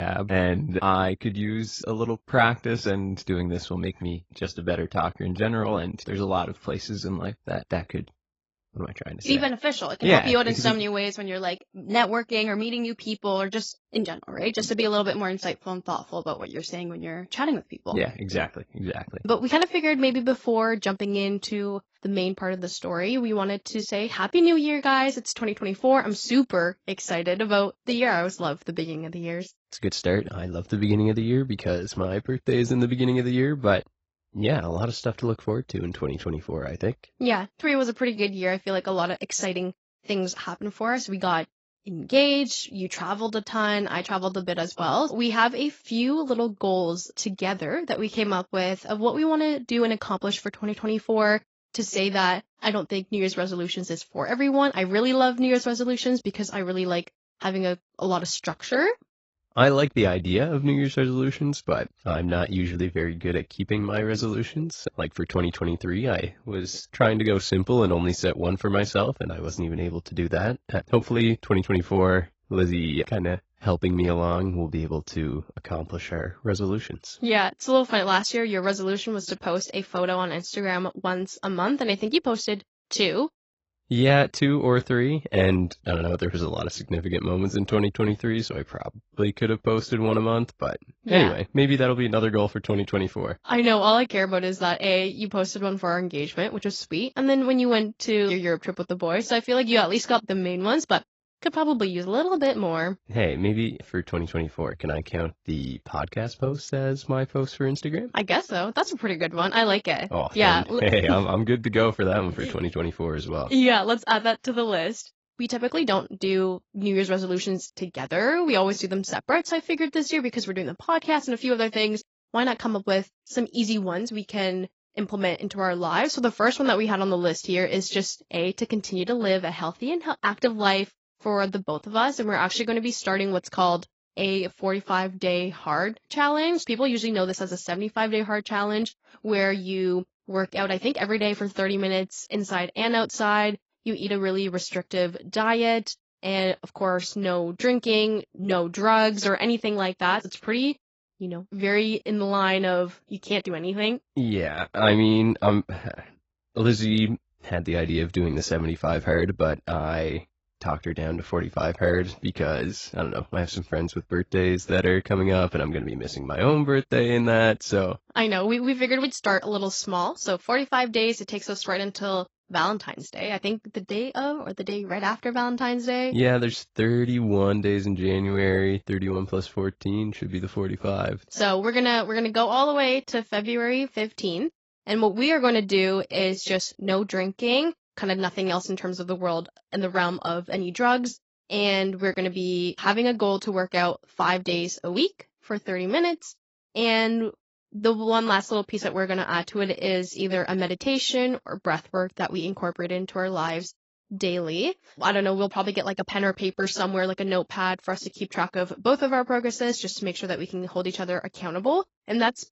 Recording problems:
garbled, watery; badly; nothing above 7.5 kHz
abrupt cut into speech; at the start

